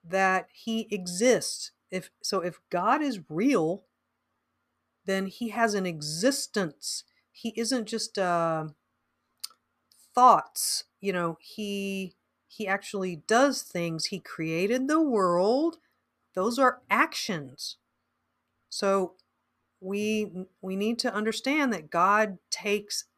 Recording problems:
none

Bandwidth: 14.5 kHz